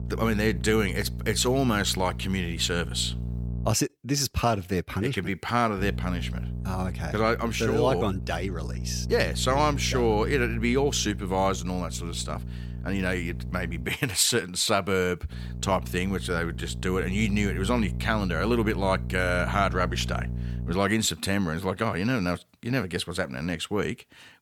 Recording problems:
electrical hum; noticeable; until 3.5 s, from 6 to 14 s and from 15 to 21 s; 60 Hz, 20 dB below the speech

